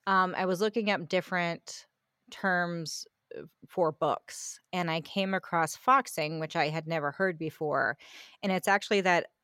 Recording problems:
none

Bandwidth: 16.5 kHz